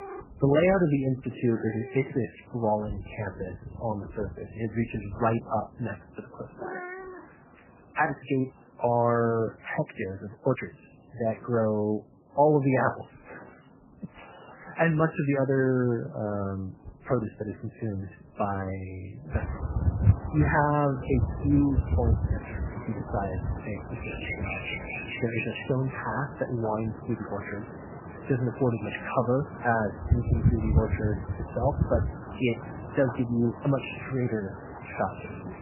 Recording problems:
garbled, watery; badly; nothing above 3 kHz
animal sounds; loud; throughout; 5 dB below the speech

